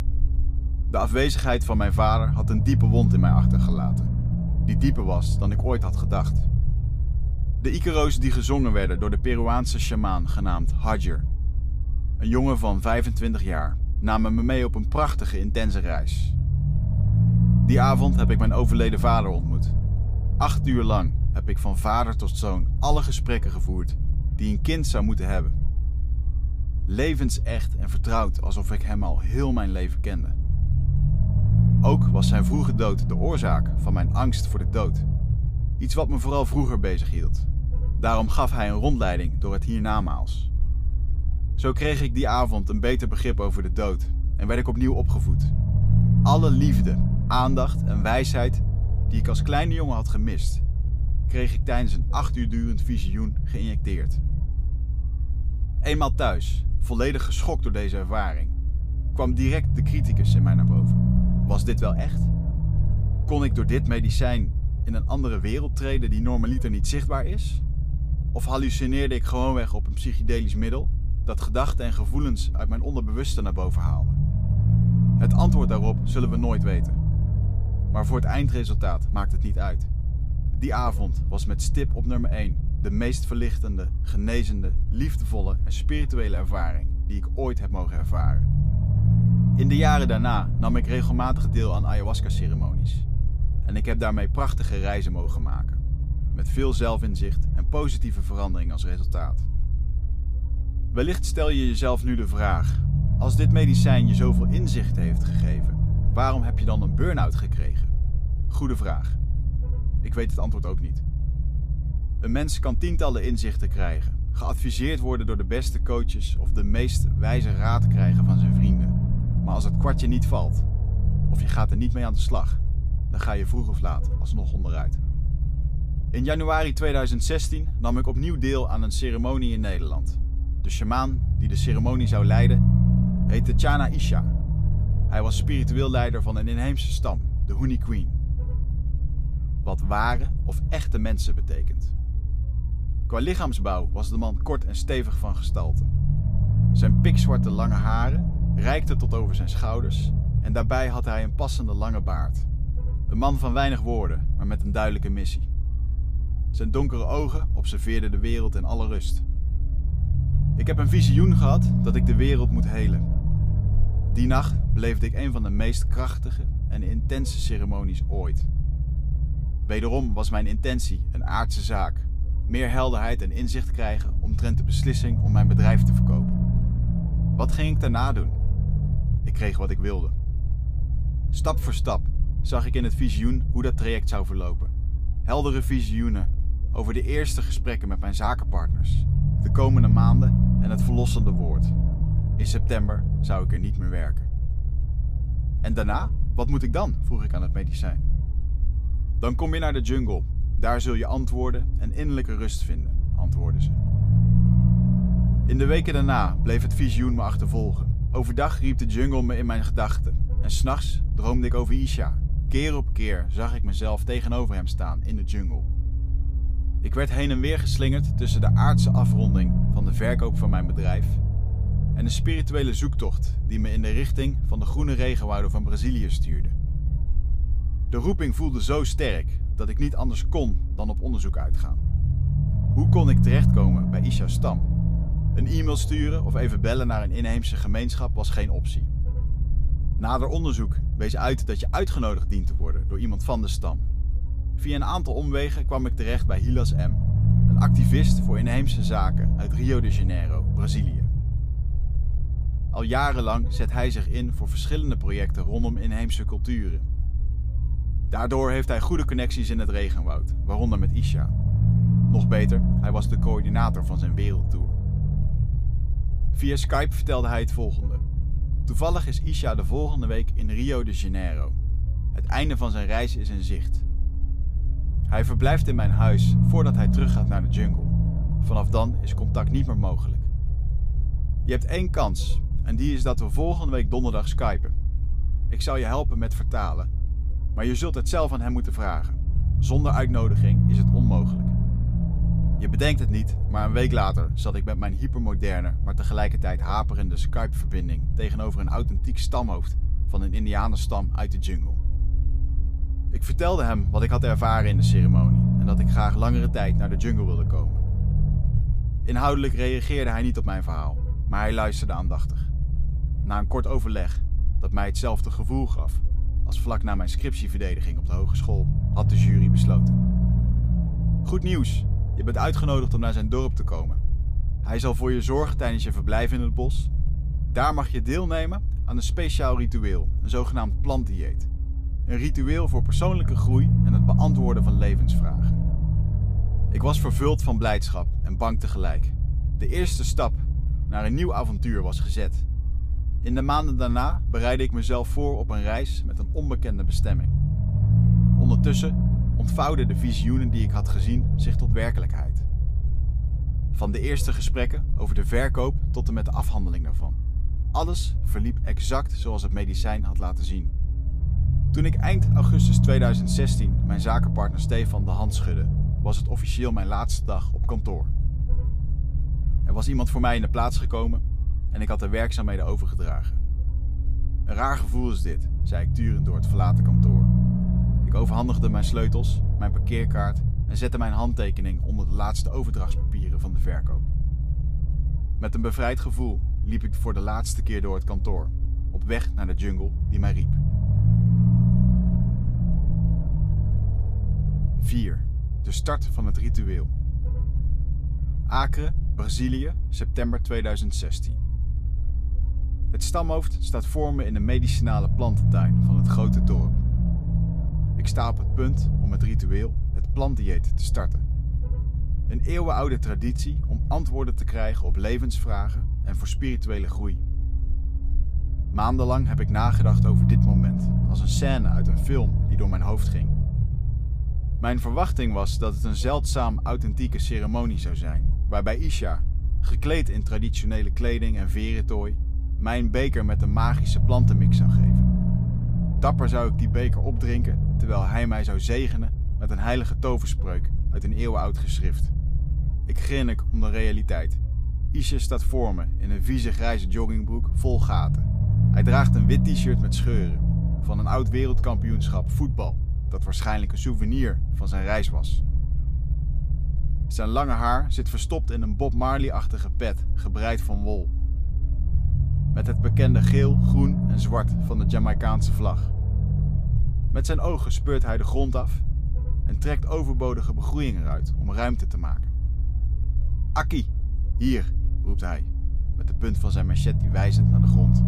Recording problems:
low rumble; loud; throughout; 8 dB below the speech

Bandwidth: 15 kHz